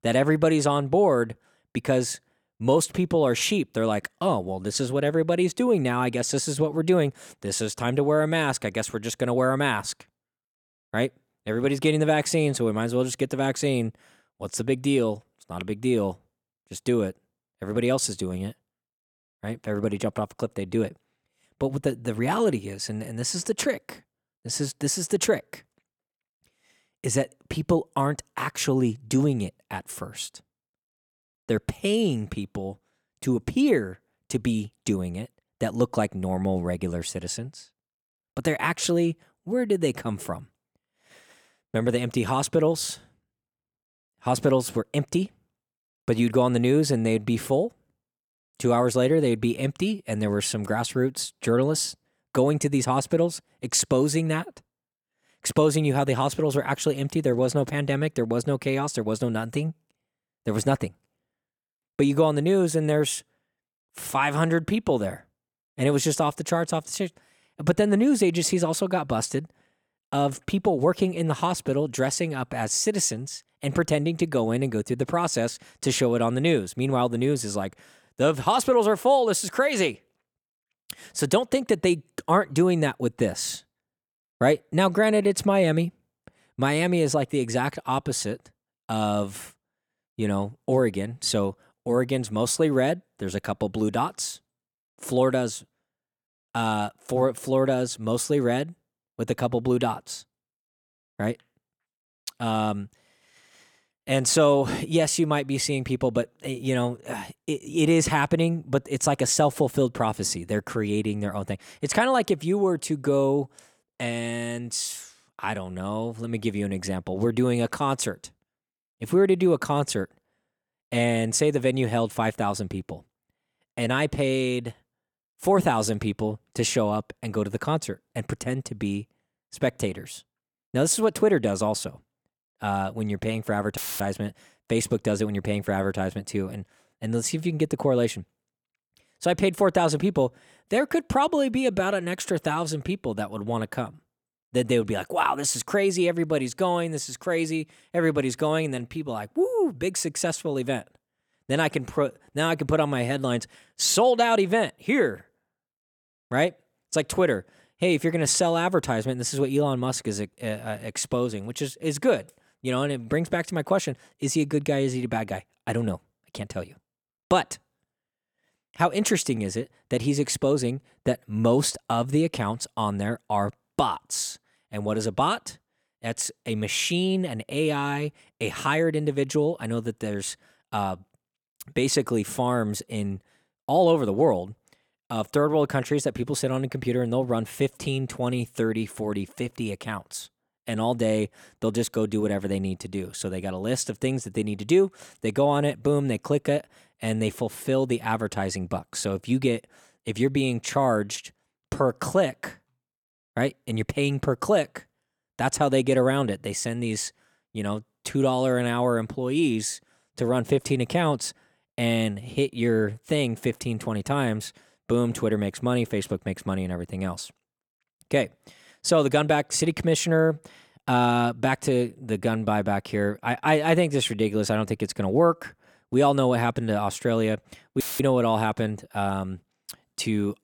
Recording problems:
audio cutting out; filled with static; at 2:14 and at 3:48

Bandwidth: 17.5 kHz